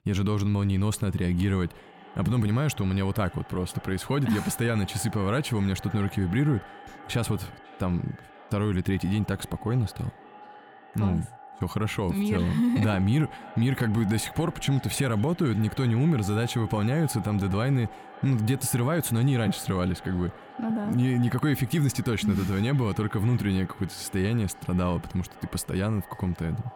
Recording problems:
echo of what is said; faint; throughout; 550 ms later, 20 dB below the speech

